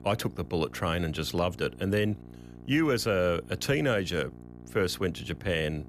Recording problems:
electrical hum; faint; throughout; 60 Hz, 25 dB below the speech

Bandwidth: 14.5 kHz